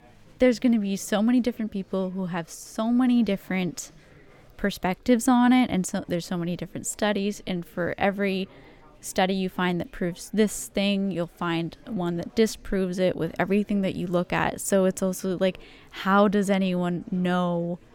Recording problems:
chatter from many people; faint; throughout; 30 dB below the speech

